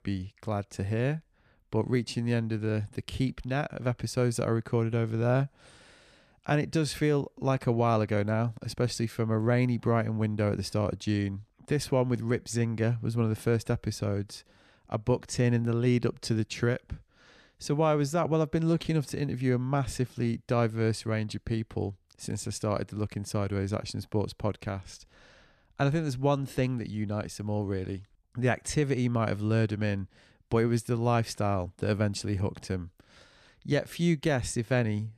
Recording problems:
none

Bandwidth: 14 kHz